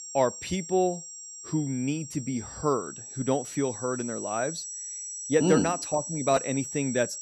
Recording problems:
high-pitched whine; loud; throughout; 7.5 kHz, 8 dB below the speech

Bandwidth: 13.5 kHz